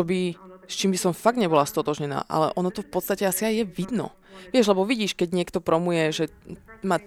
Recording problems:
voice in the background; faint; throughout; 25 dB below the speech
abrupt cut into speech; at the start

